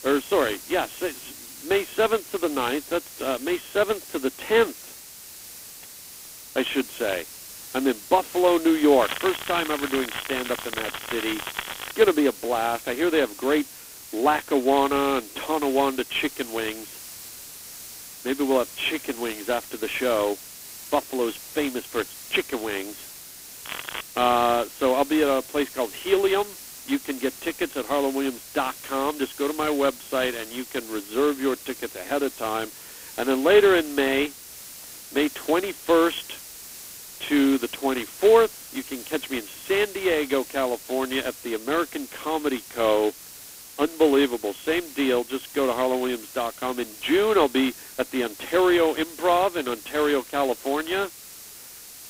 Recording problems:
phone-call audio; poor line; nothing above 4 kHz
crackling; loud; from 9 to 12 s and at 24 s; 10 dB below the speech
hiss; noticeable; throughout; 15 dB below the speech

